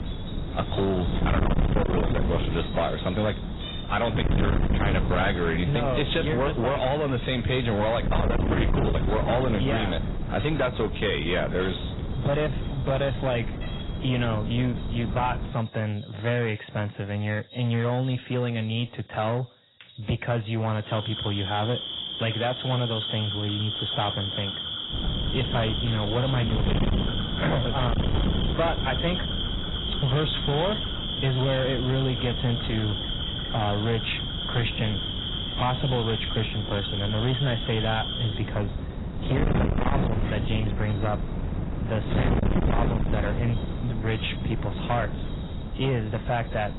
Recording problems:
distortion; heavy; 7 dB below the speech
garbled, watery; badly; nothing above 4 kHz
wind noise on the microphone; heavy; until 16 s and from 25 s on; 7 dB below the speech
animal sounds; loud; throughout; 4 dB below the speech

